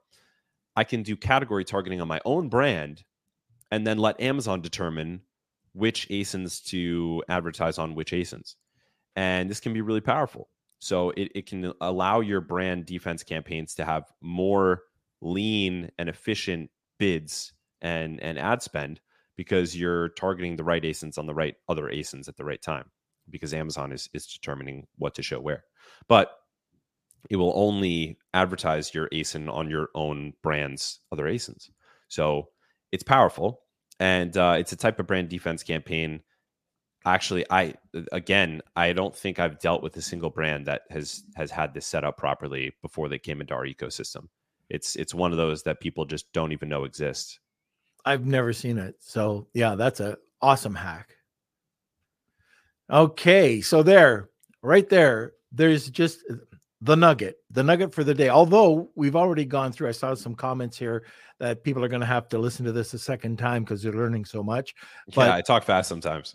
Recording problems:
none

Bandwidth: 15 kHz